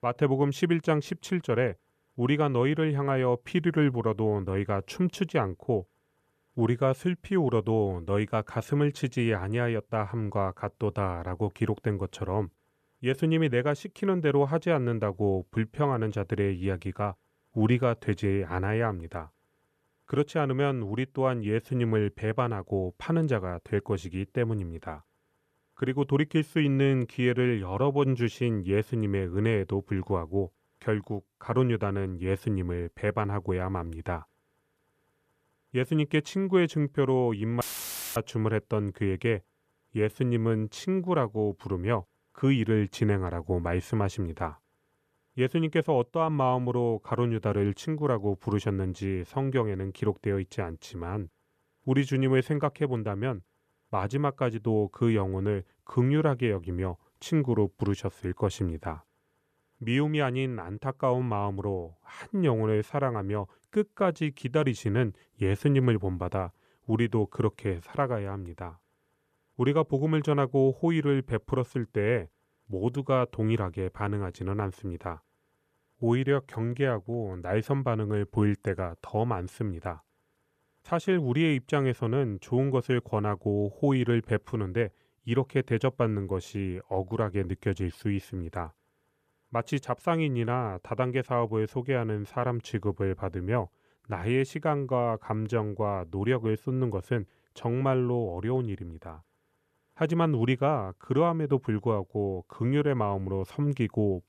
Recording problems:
audio cutting out; filled with static; at 38 s for 0.5 s

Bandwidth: 14.5 kHz